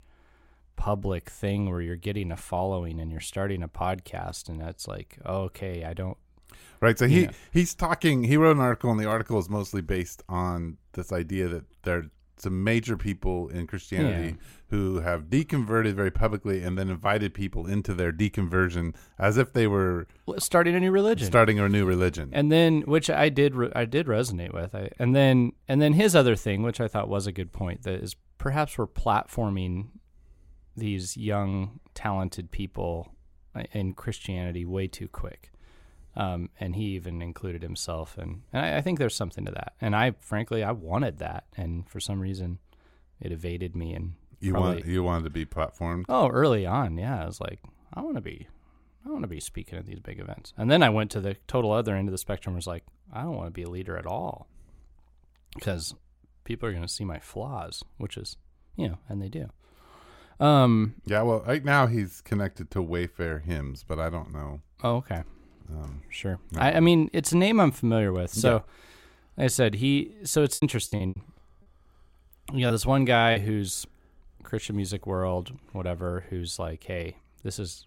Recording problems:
choppy; very; from 1:11 to 1:13; 13% of the speech affected

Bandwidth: 16.5 kHz